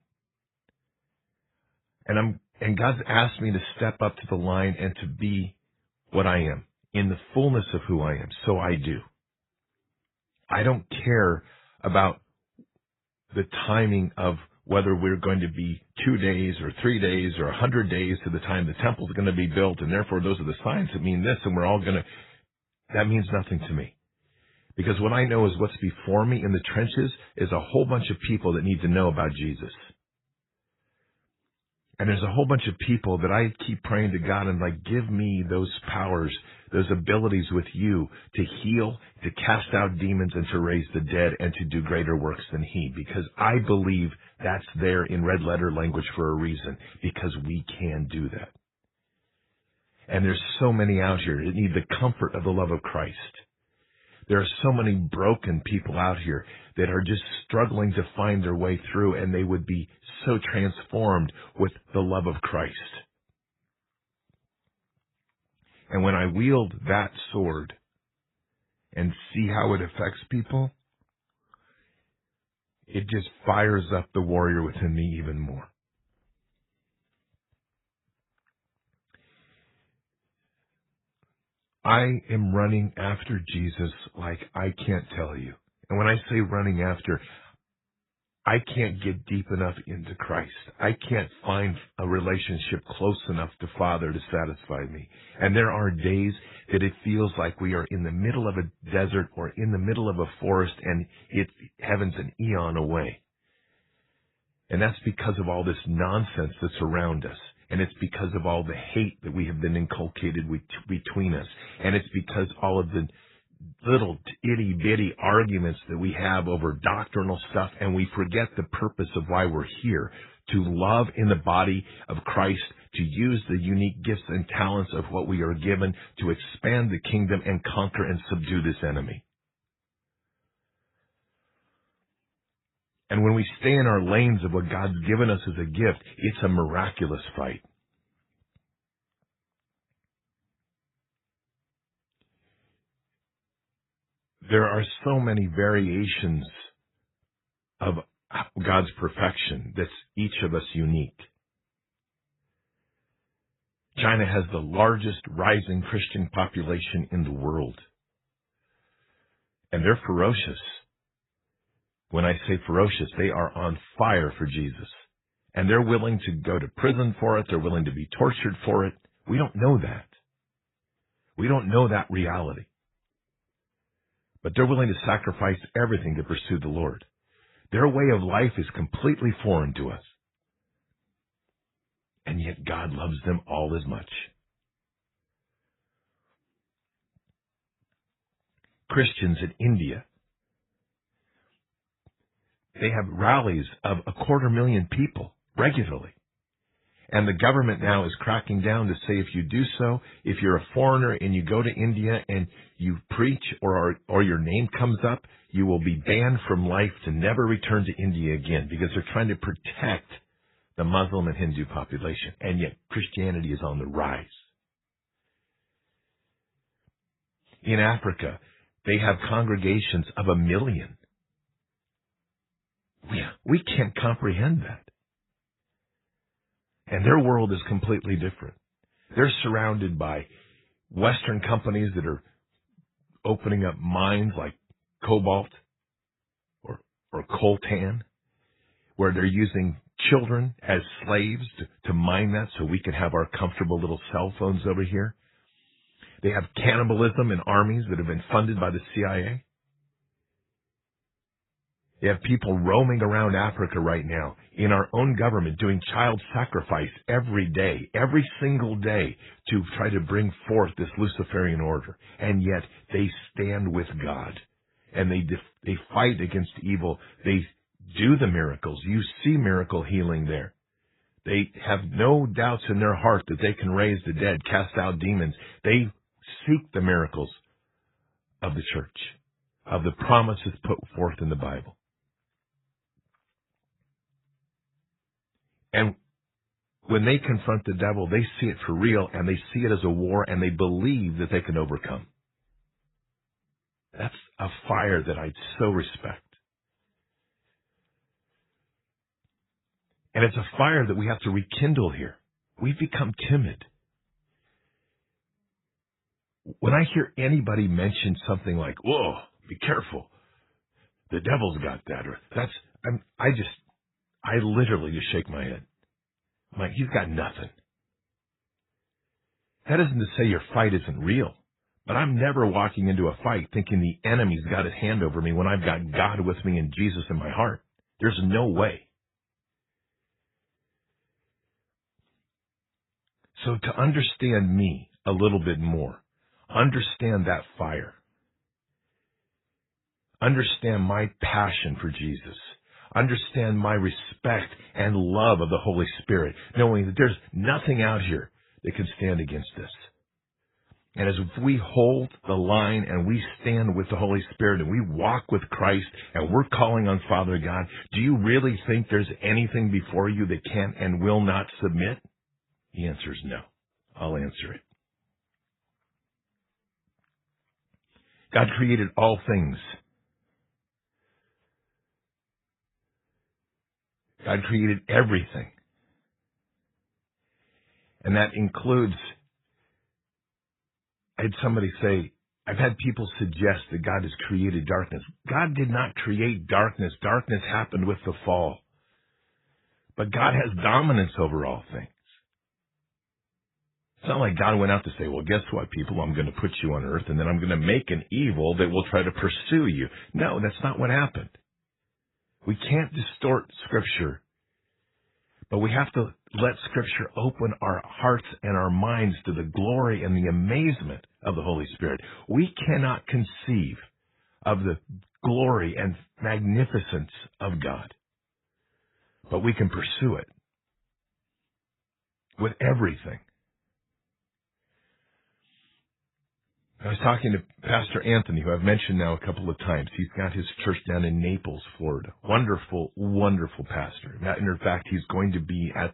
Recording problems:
garbled, watery; badly; nothing above 4 kHz

